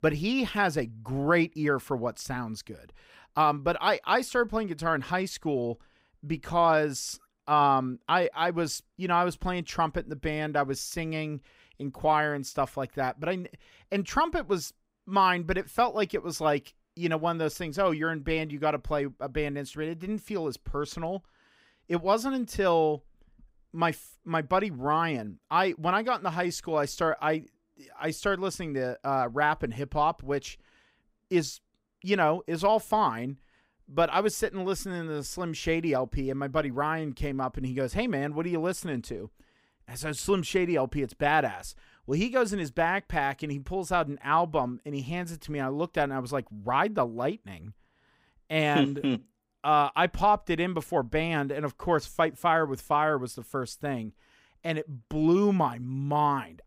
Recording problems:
none

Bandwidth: 15.5 kHz